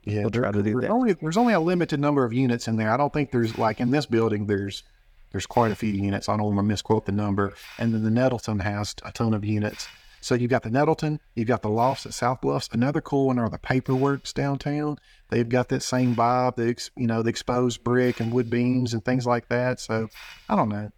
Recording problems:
hiss; faint; throughout; 25 dB below the speech

